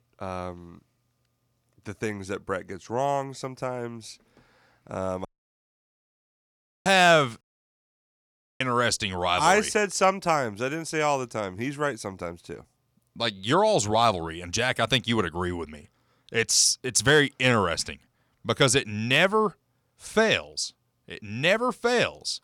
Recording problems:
audio cutting out; at 5.5 s for 1.5 s and at 7.5 s for 1 s

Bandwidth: 18.5 kHz